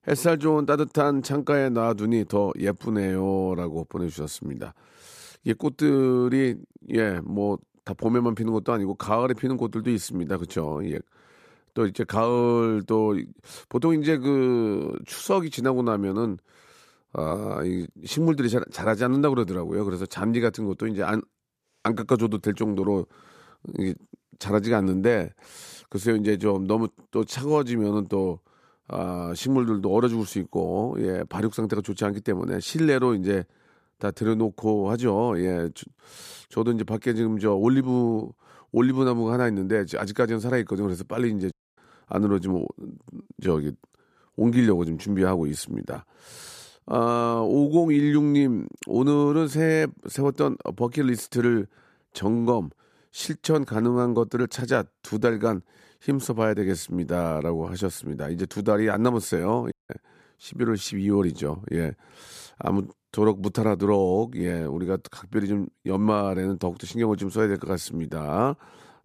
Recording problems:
audio cutting out; at 42 s and at 1:00

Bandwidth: 14.5 kHz